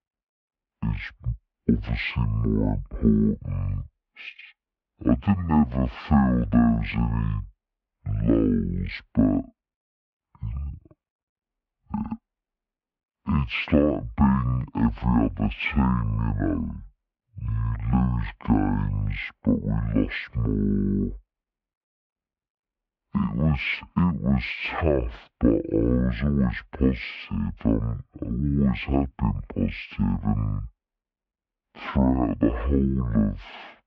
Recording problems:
wrong speed and pitch; too slow and too low; 0.5 times normal speed
muffled; slightly; fading above 2.5 kHz

